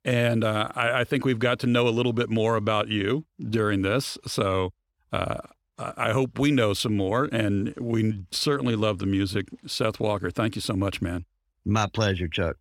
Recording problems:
none

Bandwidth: 18 kHz